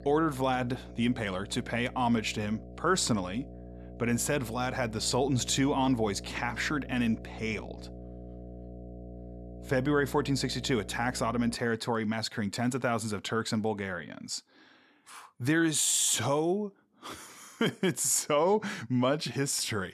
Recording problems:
electrical hum; noticeable; until 12 s; 60 Hz, 20 dB below the speech

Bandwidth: 13.5 kHz